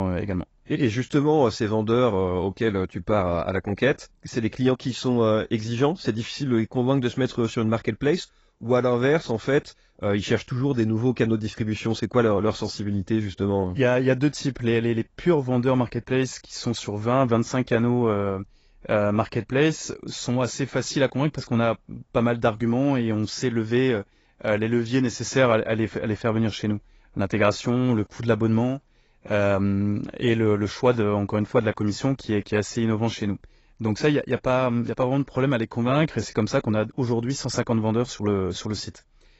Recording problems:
garbled, watery; badly; nothing above 7.5 kHz
abrupt cut into speech; at the start

